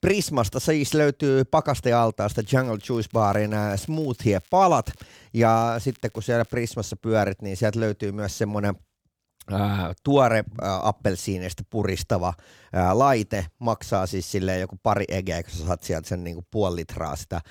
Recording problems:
crackling; faint; from 2.5 to 5 s and from 5.5 to 6.5 s; 30 dB below the speech

